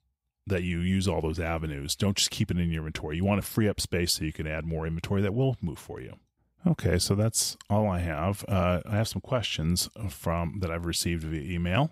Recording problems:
none

